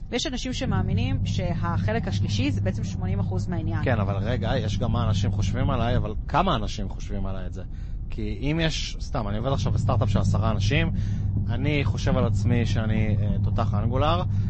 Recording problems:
garbled, watery; slightly; nothing above 7.5 kHz
low rumble; loud; throughout; 9 dB below the speech

